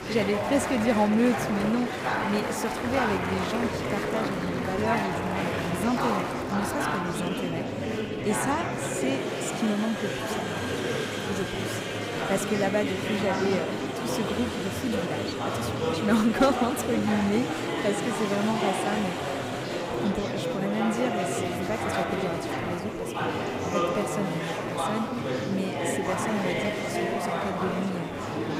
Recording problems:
murmuring crowd; very loud; throughout; 1 dB above the speech

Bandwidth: 15.5 kHz